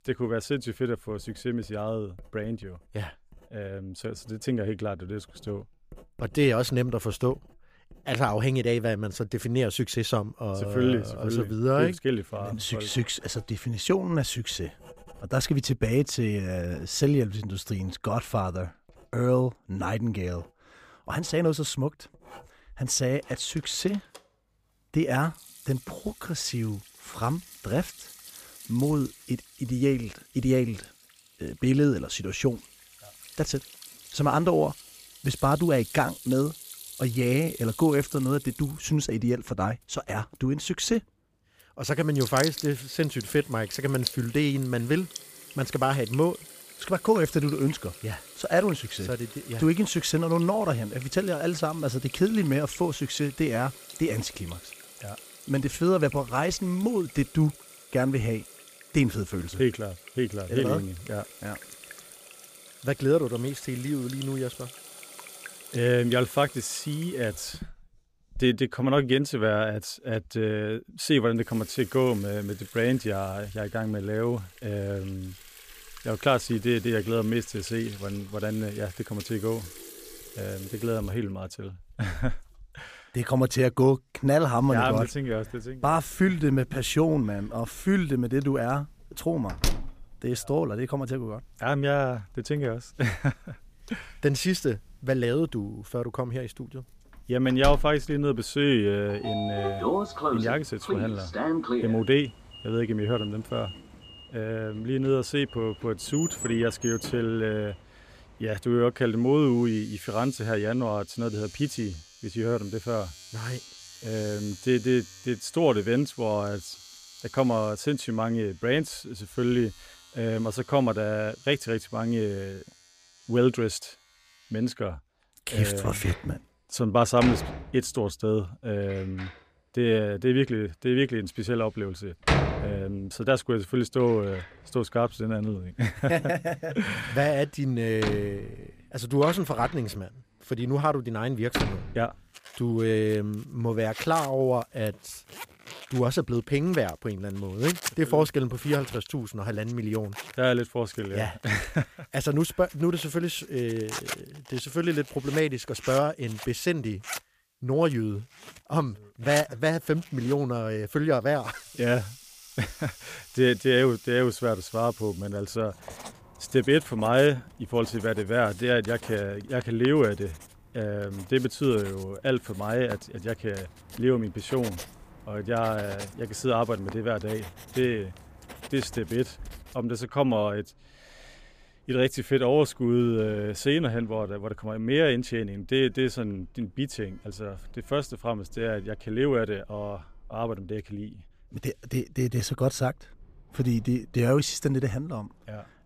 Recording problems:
household noises; noticeable; throughout; 10 dB below the speech

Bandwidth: 15 kHz